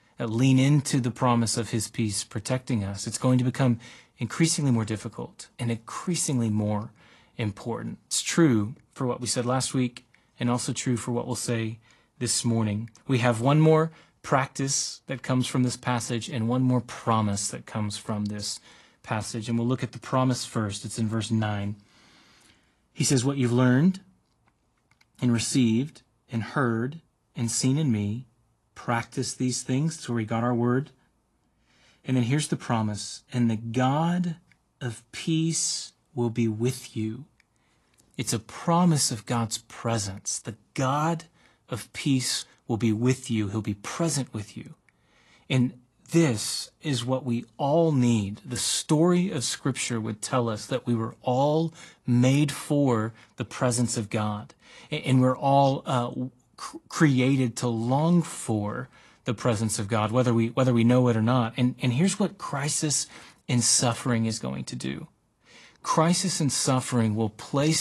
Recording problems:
garbled, watery; slightly; nothing above 11 kHz
abrupt cut into speech; at the end

